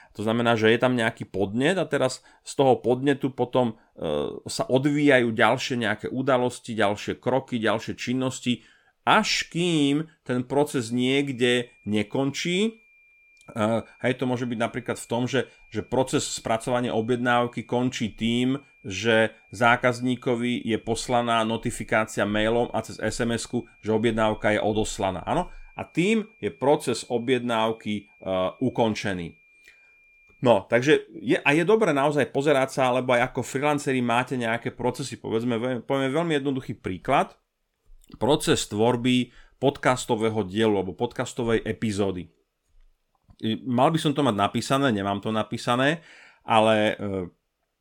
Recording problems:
high-pitched whine; faint; from 11 to 30 s; 2.5 kHz, 30 dB below the speech

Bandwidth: 17.5 kHz